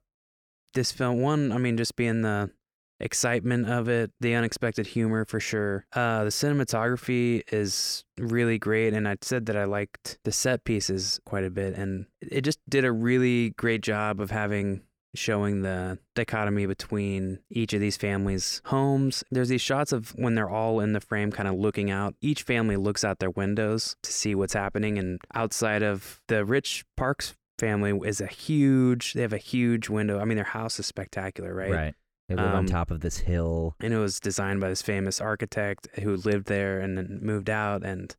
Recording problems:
none

